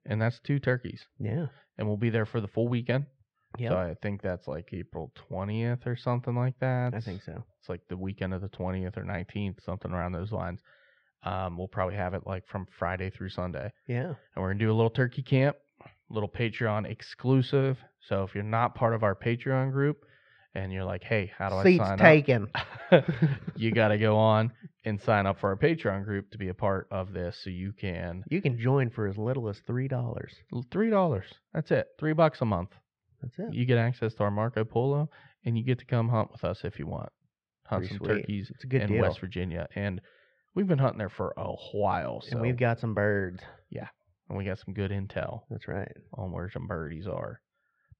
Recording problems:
muffled; slightly; fading above 3 kHz

